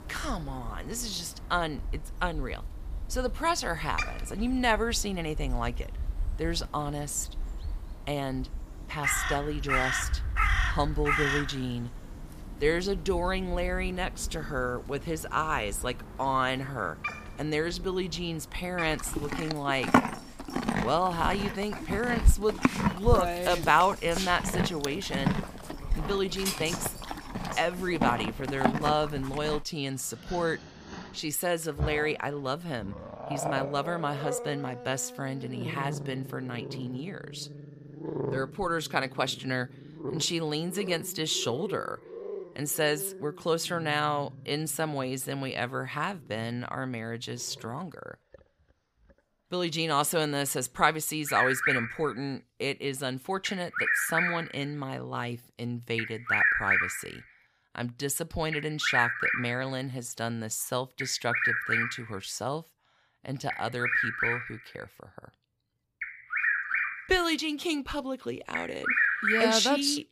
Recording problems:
animal sounds; loud; throughout; 1 dB below the speech

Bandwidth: 15 kHz